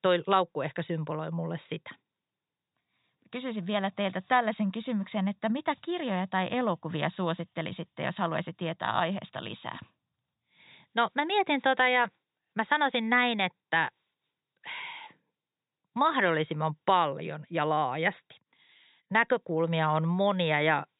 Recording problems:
high frequencies cut off; severe; nothing above 4 kHz

